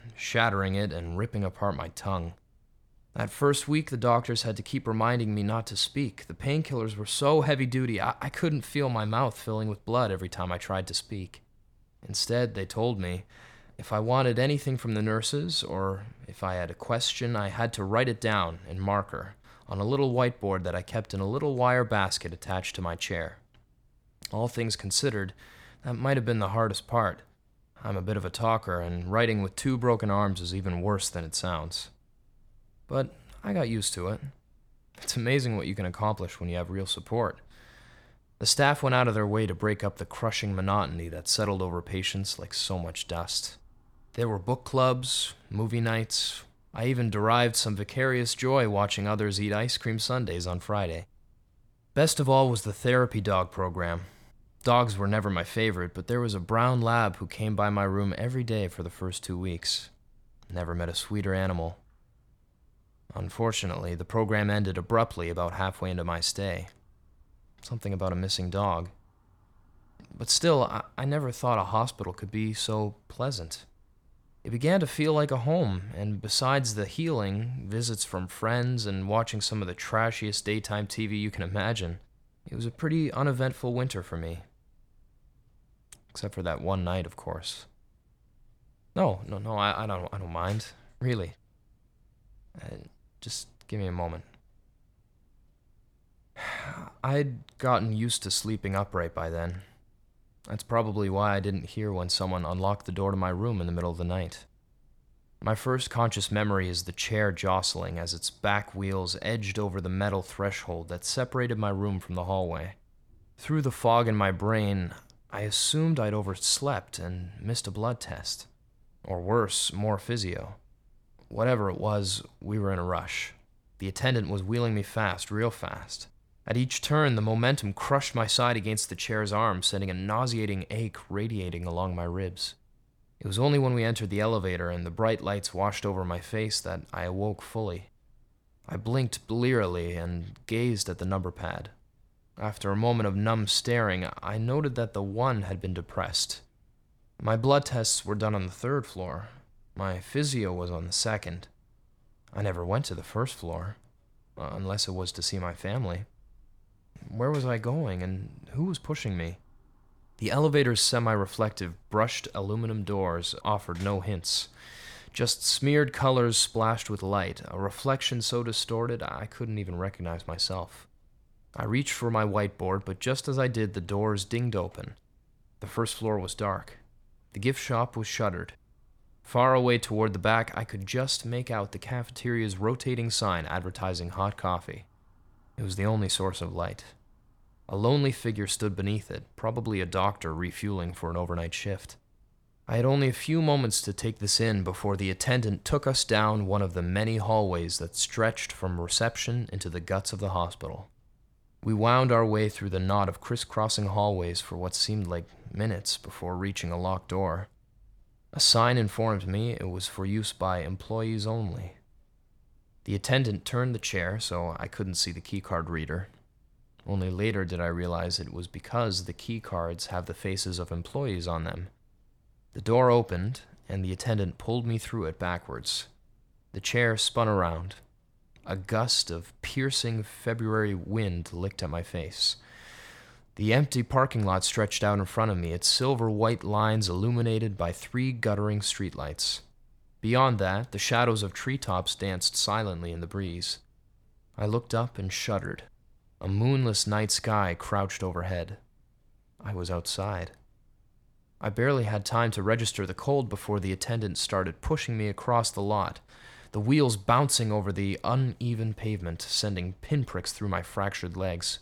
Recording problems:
none

